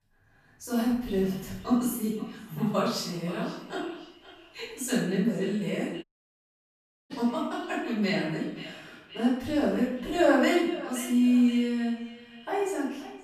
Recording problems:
off-mic speech; far
room echo; noticeable; dies away in 0.7 s
echo of what is said; faint; throughout; 520 ms later, 20 dB below the speech
audio cutting out; at 6 s for 1 s

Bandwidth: 14.5 kHz